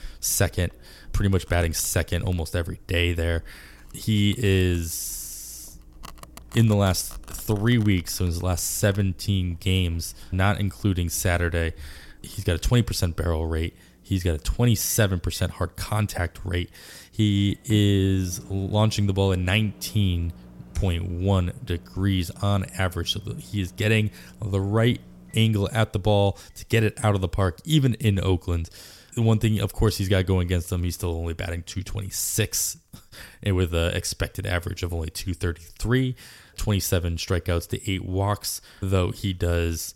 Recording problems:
household noises; faint; throughout; 25 dB below the speech

